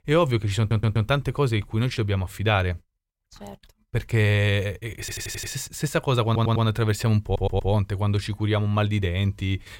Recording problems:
audio stuttering; 4 times, first at 0.5 s

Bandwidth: 16.5 kHz